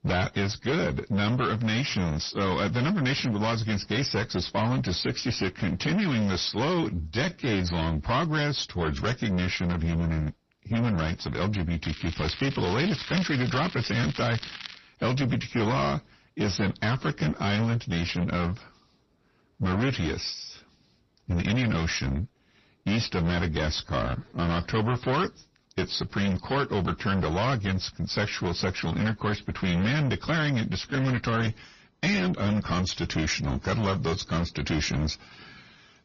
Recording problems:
distortion; heavy; 7 dB below the speech
garbled, watery; slightly; nothing above 6 kHz
crackling; noticeable; from 12 to 15 s; 10 dB below the speech
uneven, jittery; slightly; from 7 to 31 s

